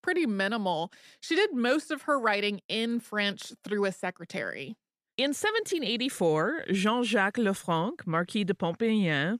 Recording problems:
none

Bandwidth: 14.5 kHz